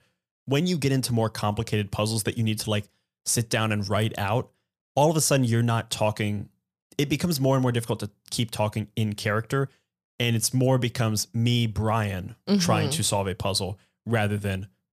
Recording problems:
none

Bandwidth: 14.5 kHz